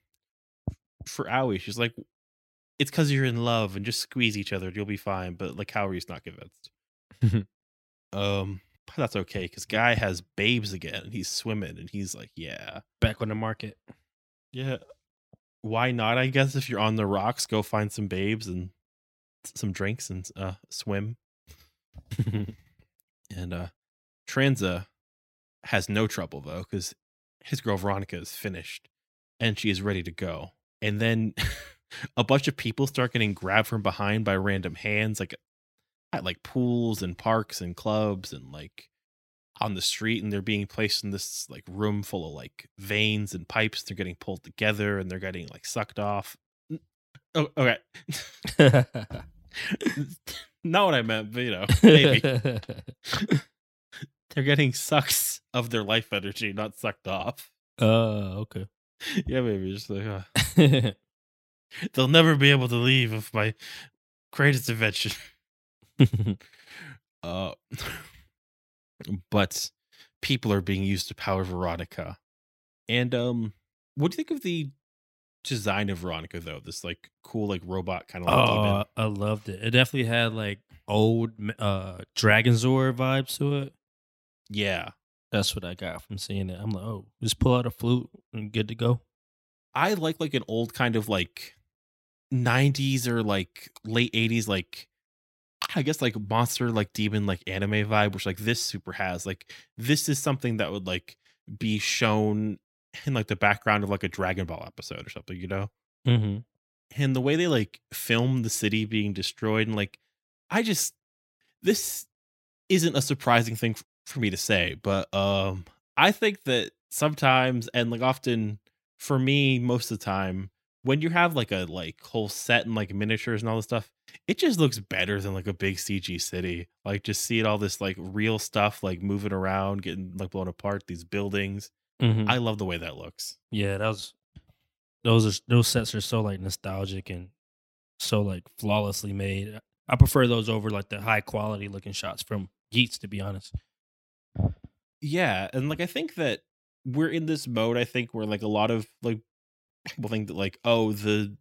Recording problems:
none

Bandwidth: 16.5 kHz